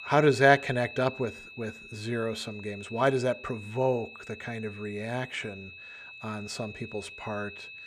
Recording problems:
high-pitched whine; noticeable; throughout; 2.5 kHz, 15 dB below the speech

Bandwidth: 15 kHz